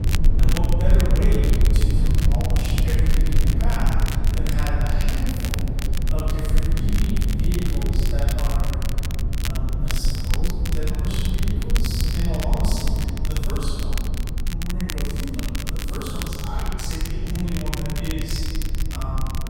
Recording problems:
room echo; strong; dies away in 2 s
off-mic speech; far
low rumble; loud; throughout; 5 dB below the speech
crackle, like an old record; loud; 4 dB below the speech

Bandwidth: 16 kHz